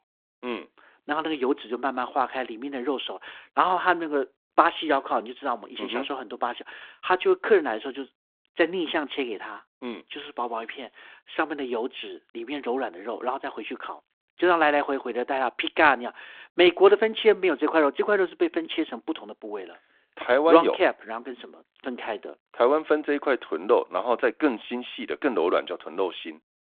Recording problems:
phone-call audio

